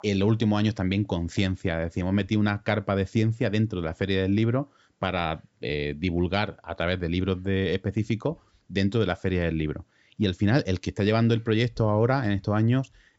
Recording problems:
high frequencies cut off; noticeable; nothing above 8 kHz

